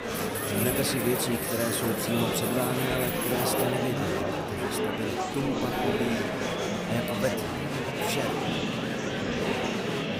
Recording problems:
murmuring crowd; very loud; throughout; 2 dB above the speech
household noises; loud; throughout; 4 dB below the speech

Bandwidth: 15.5 kHz